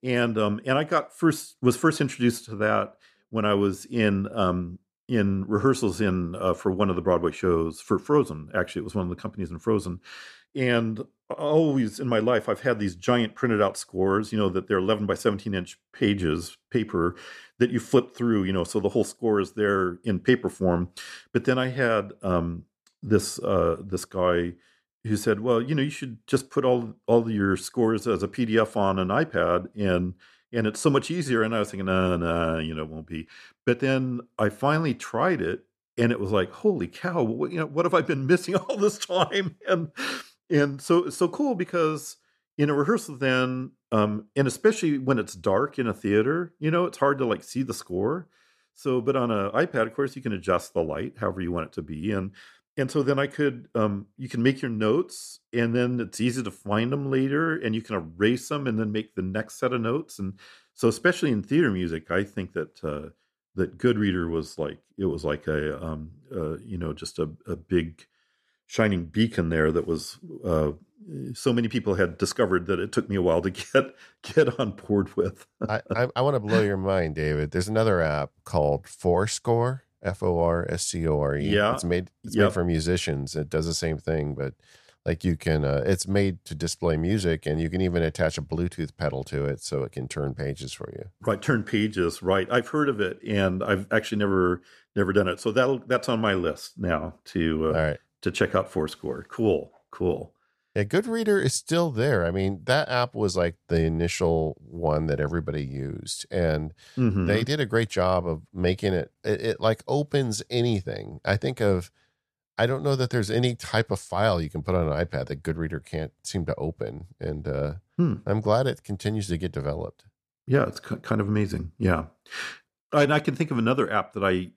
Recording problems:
none

